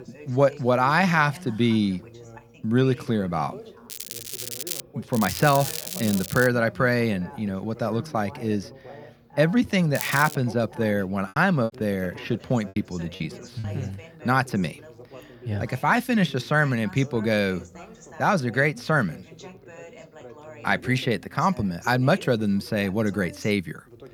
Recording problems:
crackling; loud; at 4 s, from 5 to 6.5 s and at 10 s; 8 dB below the speech
background chatter; noticeable; throughout; 2 voices, 20 dB below the speech
choppy; very; from 11 to 14 s; 7% of the speech affected

